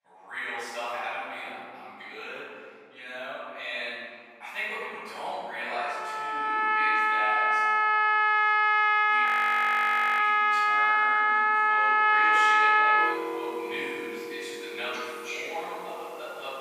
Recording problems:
room echo; strong; dies away in 2.5 s
off-mic speech; far
thin; very; fading below 800 Hz
background music; very loud; from 6 s on; 15 dB above the speech
audio freezing; at 9.5 s for 1 s

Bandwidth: 15 kHz